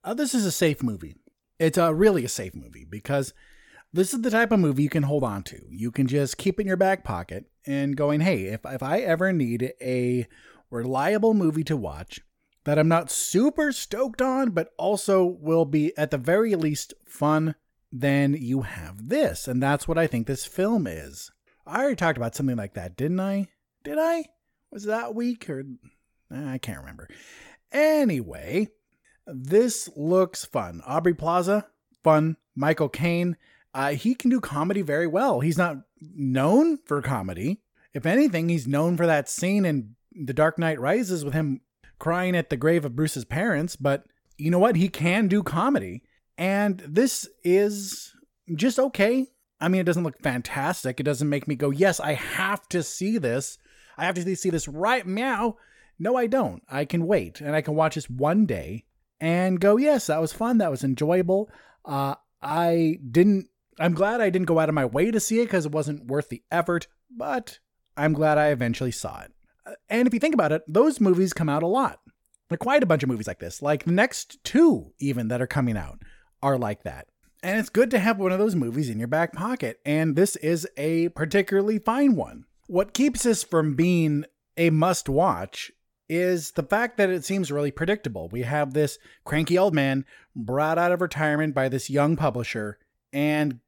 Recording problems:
uneven, jittery; strongly; from 3.5 s to 1:30

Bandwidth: 17.5 kHz